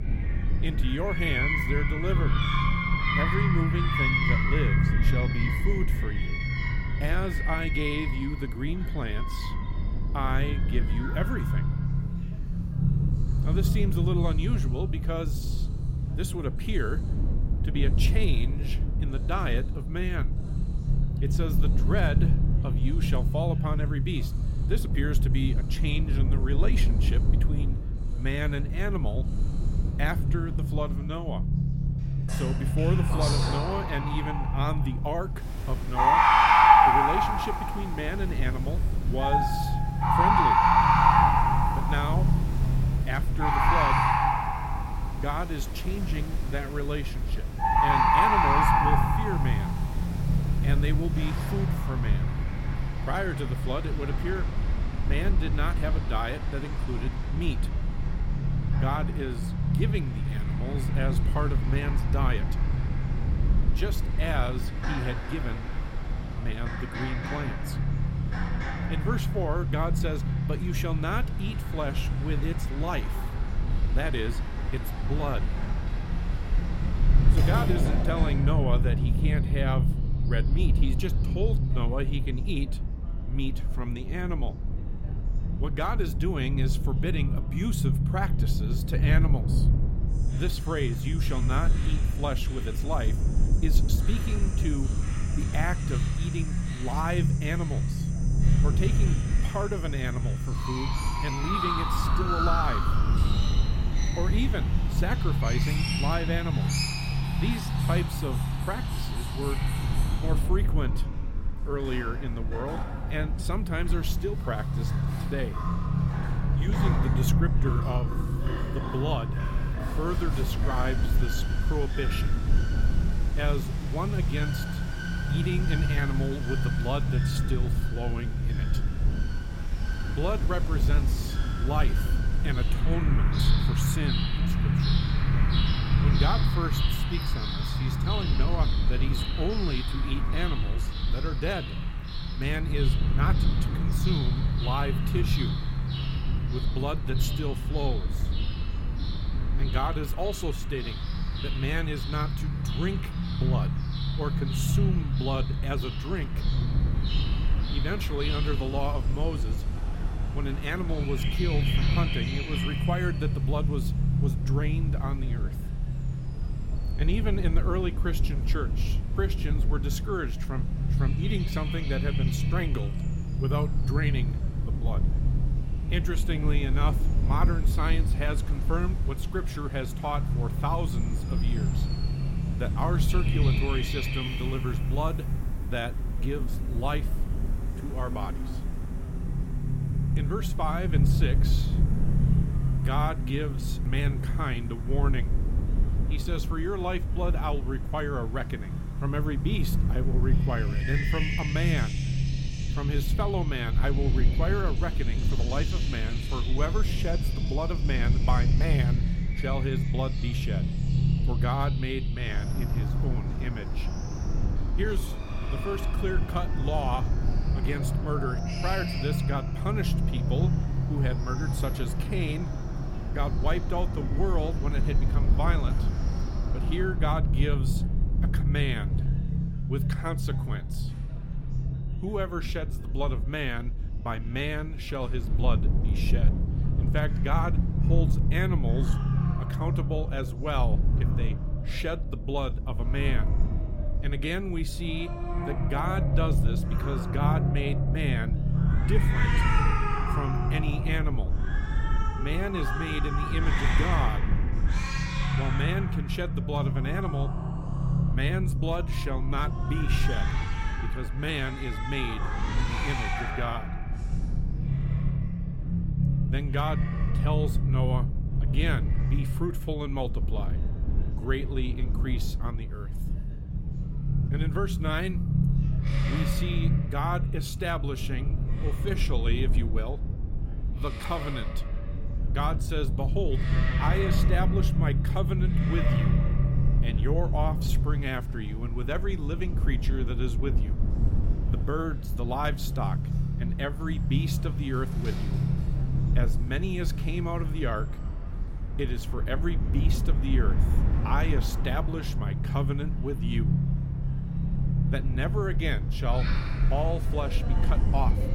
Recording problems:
animal sounds; very loud; throughout; 1 dB above the speech
low rumble; loud; throughout; 7 dB below the speech
electrical hum; faint; throughout; 50 Hz, 30 dB below the speech
background chatter; faint; throughout; 3 voices, 25 dB below the speech

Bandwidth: 16.5 kHz